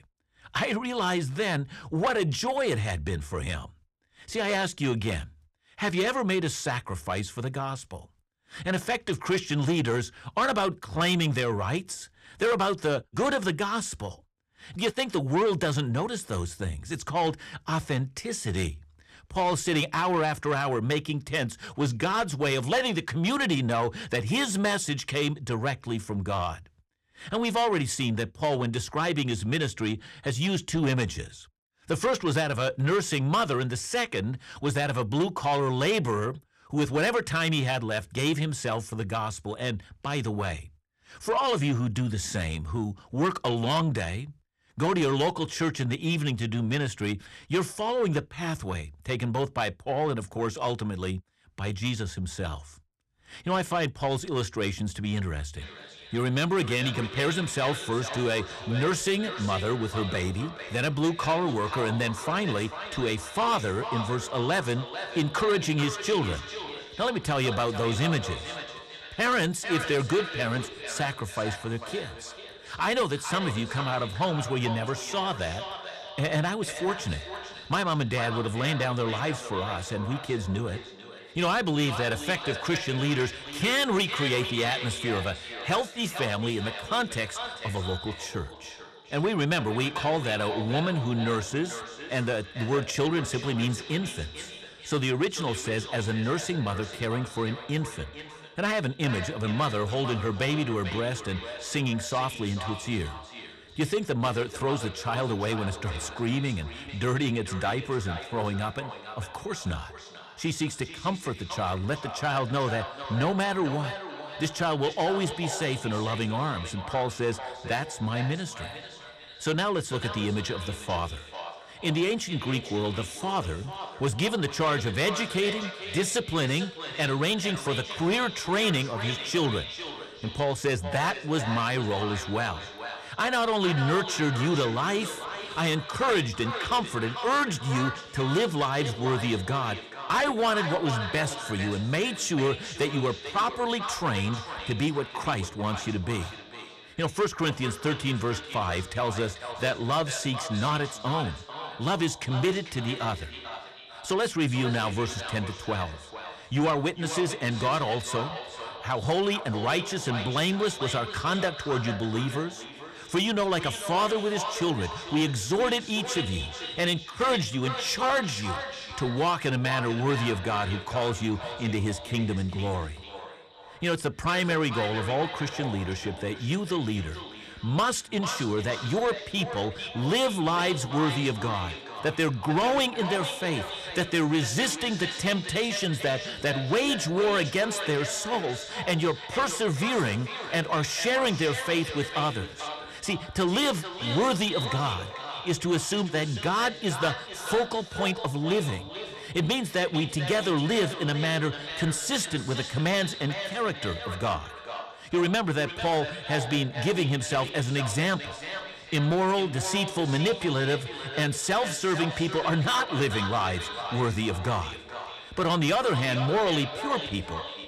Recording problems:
echo of what is said; strong; from 56 s on; 440 ms later, 9 dB below the speech
distortion; slight; 10 dB below the speech

